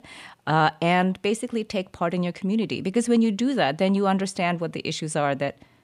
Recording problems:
none

